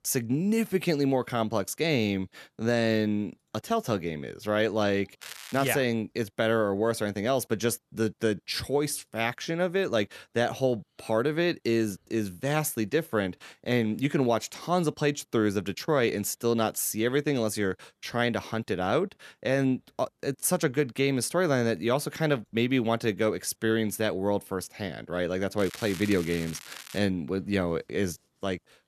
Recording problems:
crackling; noticeable; at 5 s and from 26 to 27 s; 15 dB below the speech

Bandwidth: 13.5 kHz